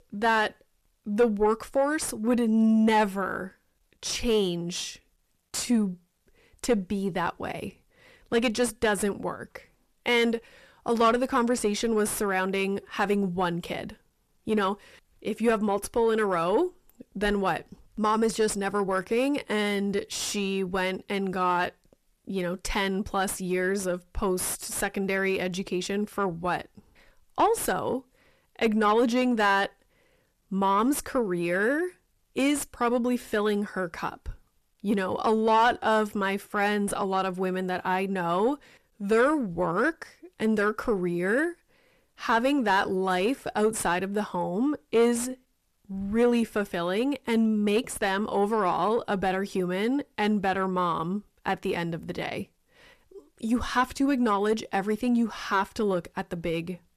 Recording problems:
distortion; slight; 10 dB below the speech

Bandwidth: 14 kHz